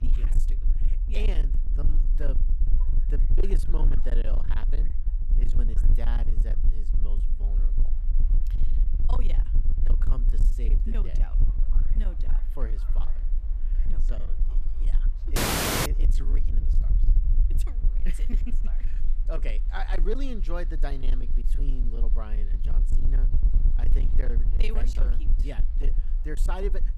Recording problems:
distortion; slight; 18% of the sound clipped
low rumble; loud; throughout; 7 dB below the speech
train or aircraft noise; faint; throughout; 20 dB below the speech
audio freezing; at 15 s for 0.5 s

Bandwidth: 14.5 kHz